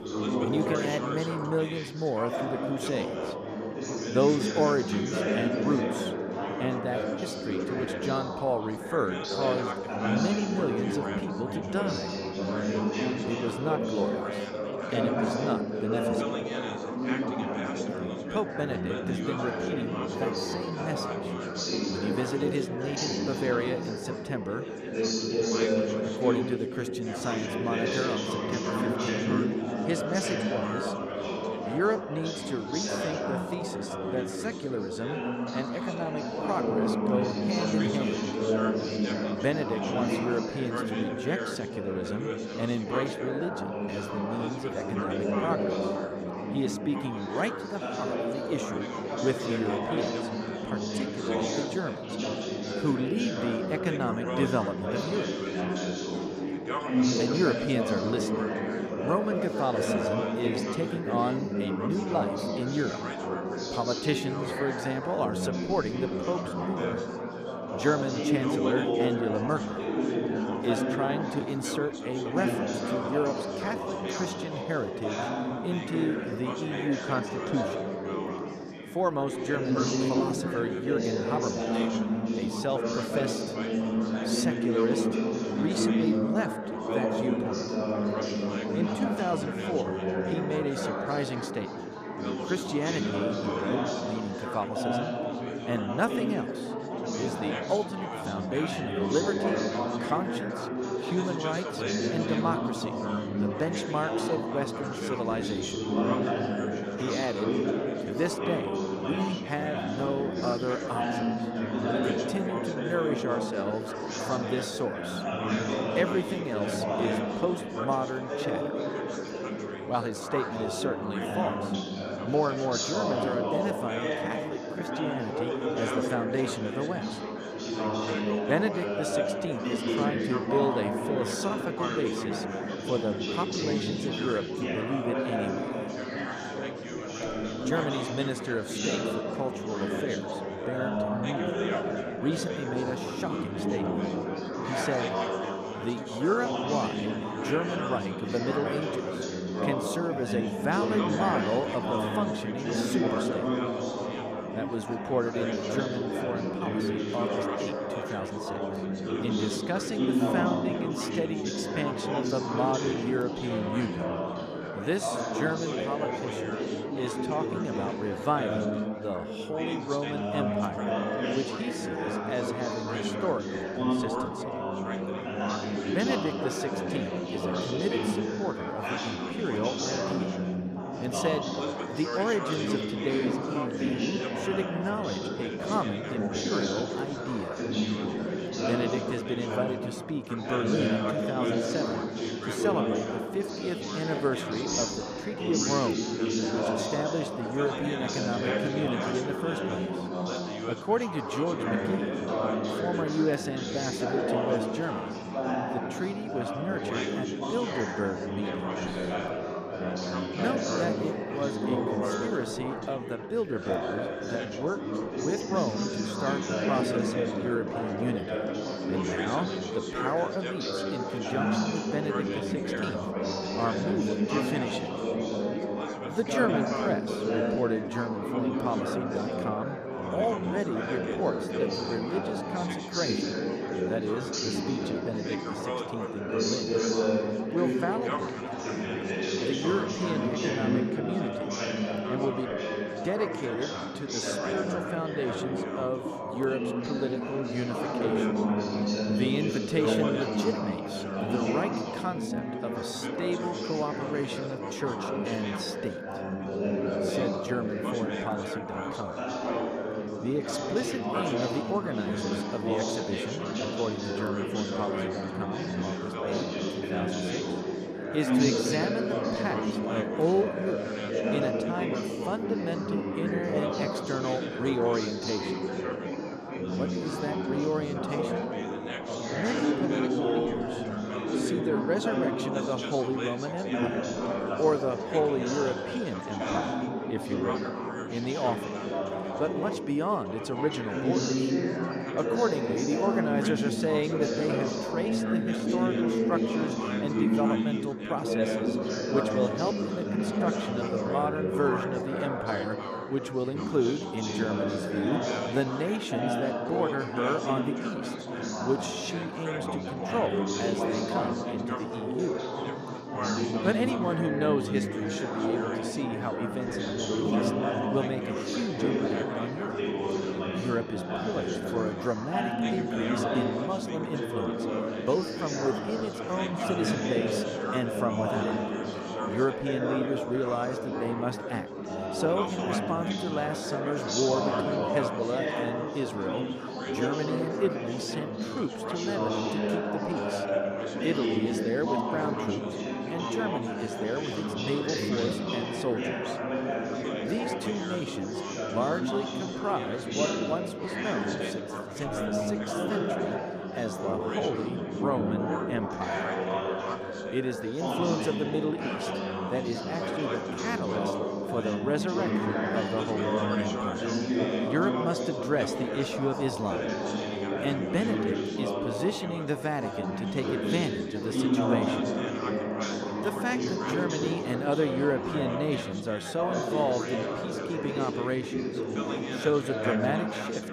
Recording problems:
chatter from many people; very loud; throughout; 2 dB above the speech

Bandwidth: 14.5 kHz